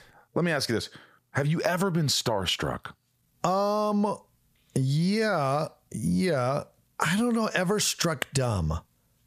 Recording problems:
squashed, flat; heavily

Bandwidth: 14.5 kHz